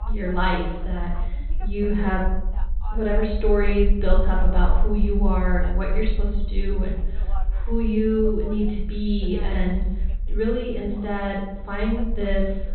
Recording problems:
off-mic speech; far
high frequencies cut off; severe; nothing above 4 kHz
room echo; noticeable; dies away in 0.8 s
voice in the background; faint; throughout; 20 dB below the speech
low rumble; faint; throughout; 25 dB below the speech

